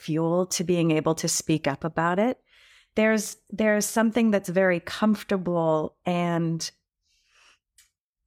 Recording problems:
none

